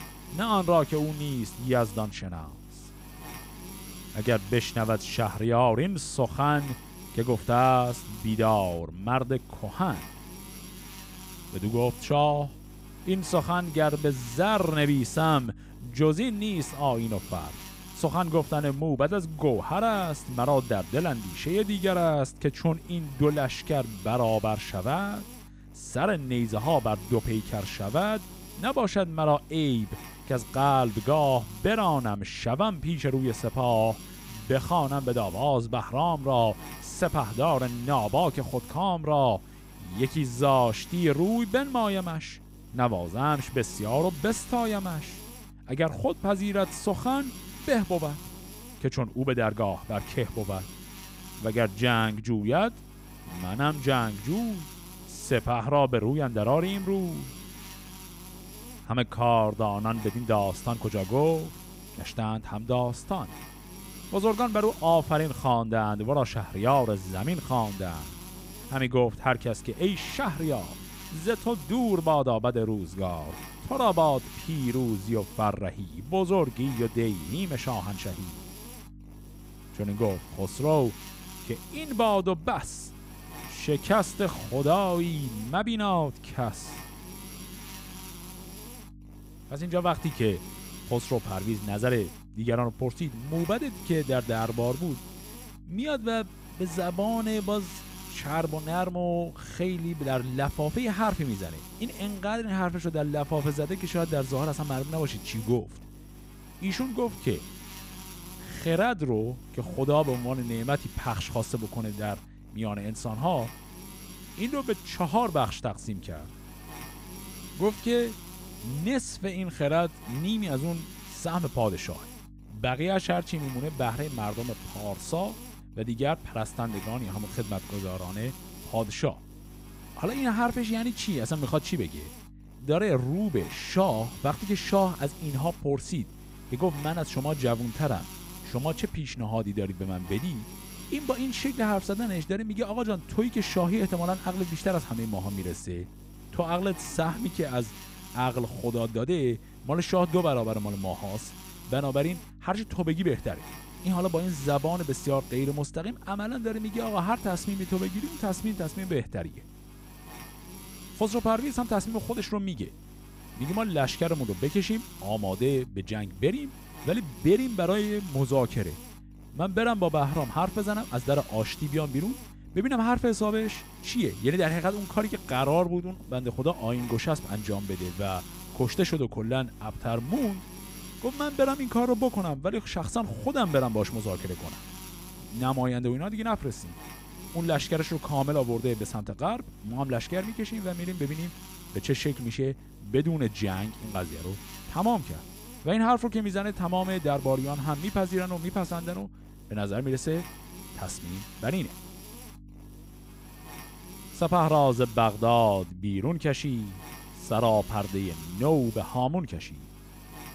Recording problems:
electrical hum; noticeable; throughout; 50 Hz, 15 dB below the speech

